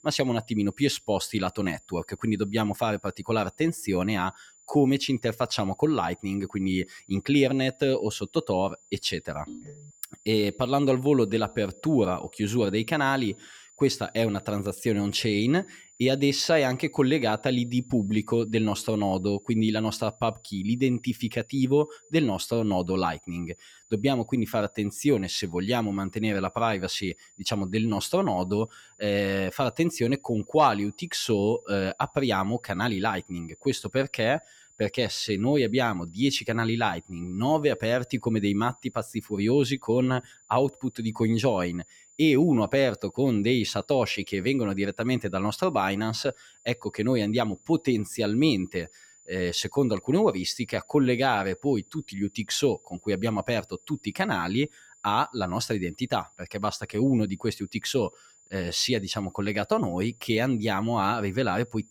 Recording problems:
high-pitched whine; faint; throughout; 7 kHz, 30 dB below the speech
phone ringing; faint; at 9.5 s; peak 15 dB below the speech

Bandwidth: 17 kHz